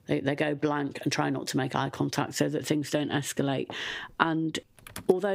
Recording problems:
squashed, flat; somewhat, background pumping
household noises; noticeable; throughout; 15 dB below the speech
abrupt cut into speech; at the end

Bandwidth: 15.5 kHz